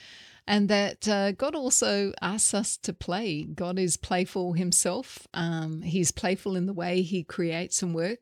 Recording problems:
none

